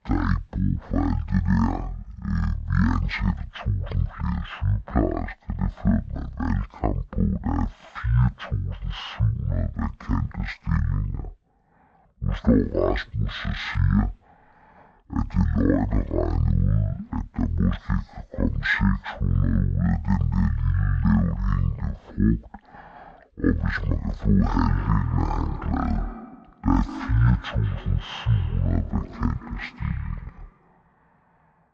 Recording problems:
wrong speed and pitch; too slow and too low; 0.5 times normal speed
echo of what is said; noticeable; from 25 s on; 190 ms later, 15 dB below the speech

